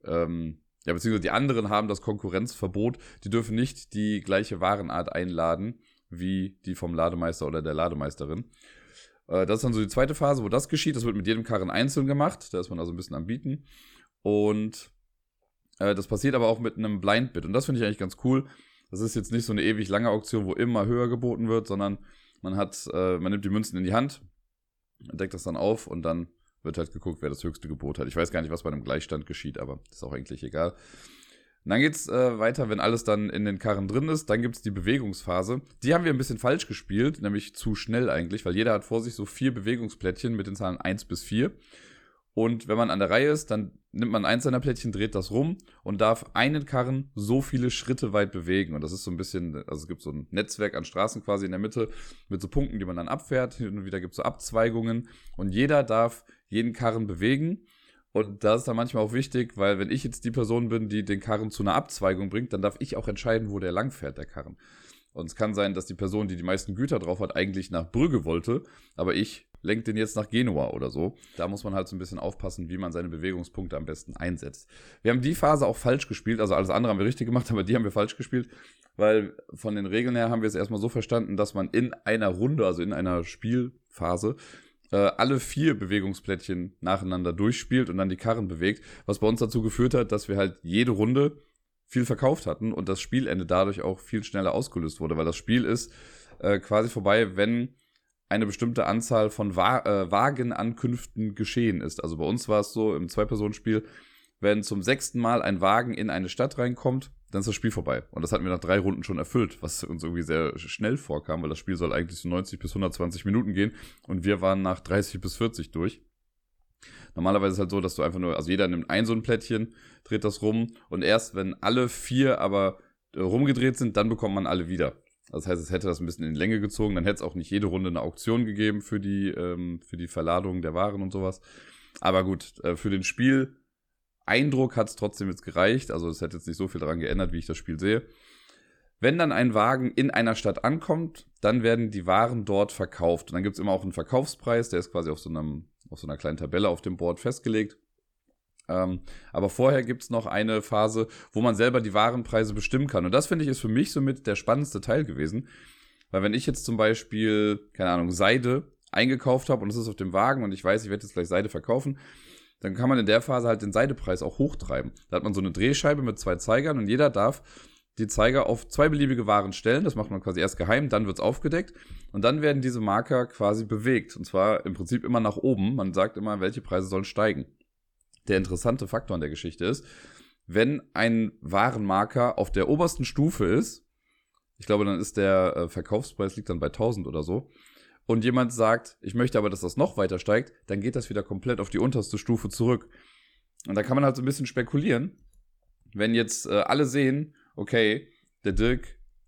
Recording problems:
none

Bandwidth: 18.5 kHz